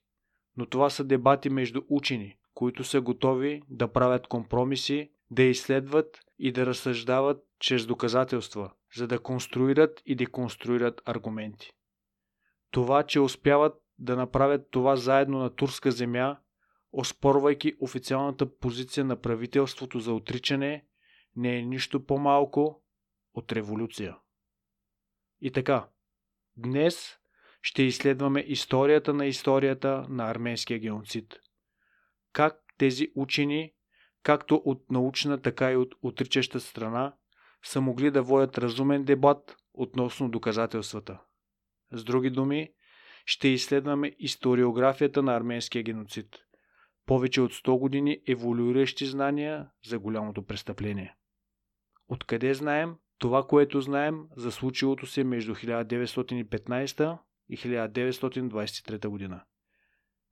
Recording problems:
none

